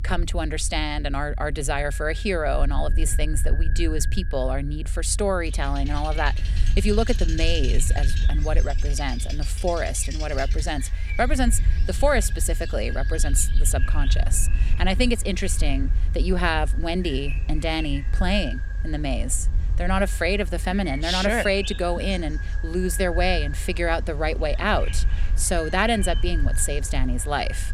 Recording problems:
echo of what is said; noticeable; throughout; 550 ms later, 15 dB below the speech
animal sounds; noticeable; throughout; 15 dB below the speech
low rumble; faint; throughout; 20 dB below the speech

